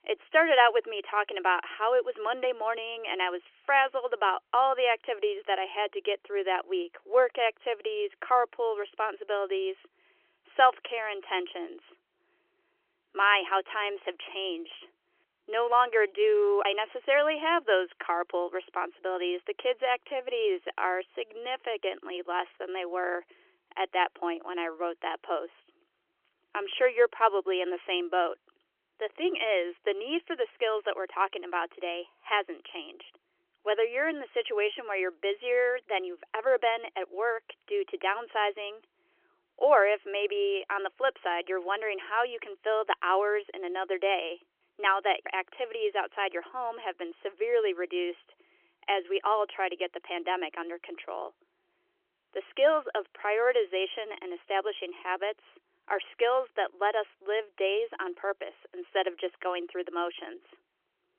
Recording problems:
phone-call audio; nothing above 3.5 kHz

